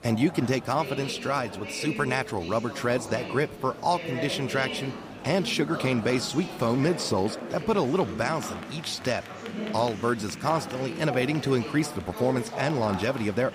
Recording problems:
murmuring crowd; loud; throughout; 9 dB below the speech

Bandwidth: 15 kHz